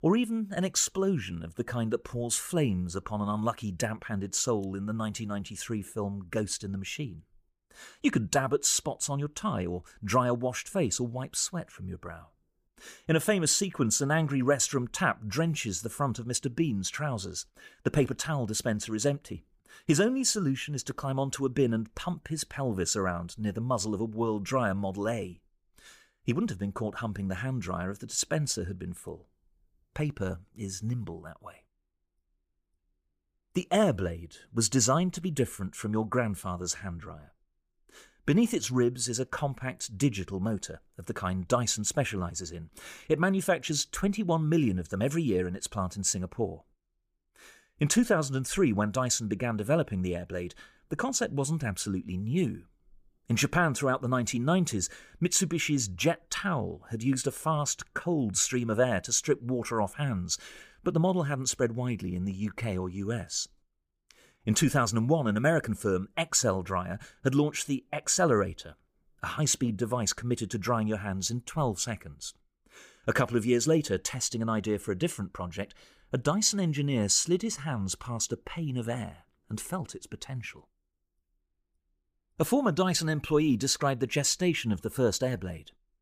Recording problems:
none

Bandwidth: 15 kHz